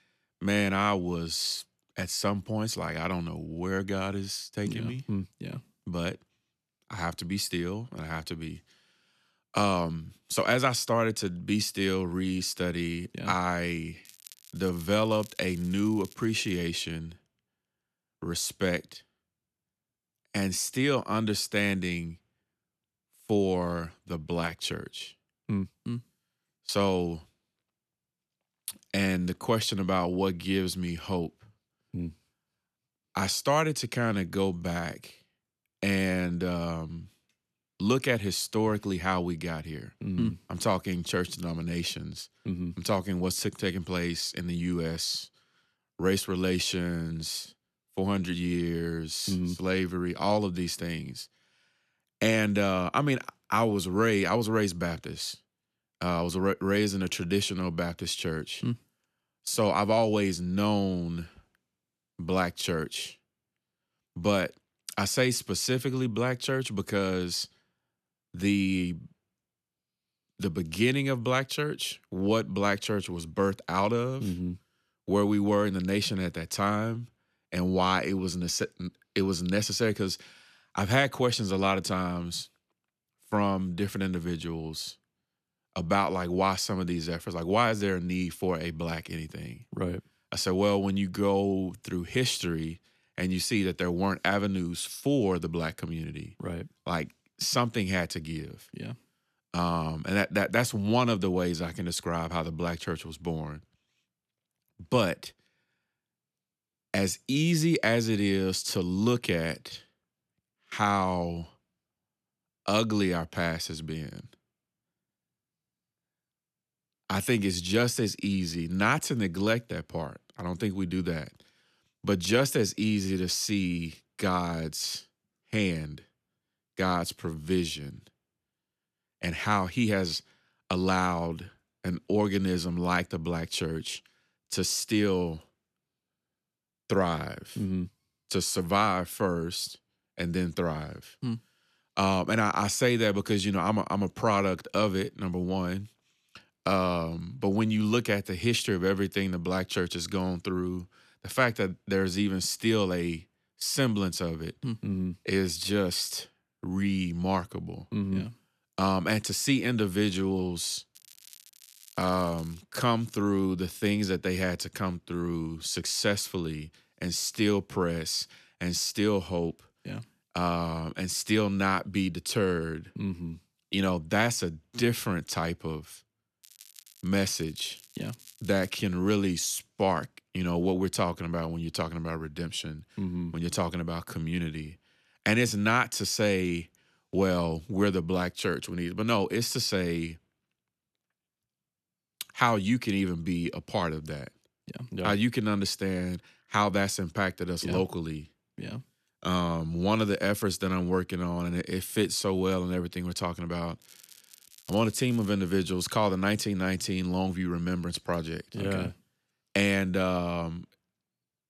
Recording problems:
crackling; faint; 4 times, first at 14 s; 20 dB below the speech

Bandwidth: 14 kHz